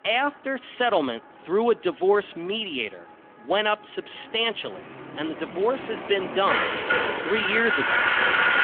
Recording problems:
phone-call audio; nothing above 3.5 kHz
traffic noise; very loud; throughout; 2 dB above the speech

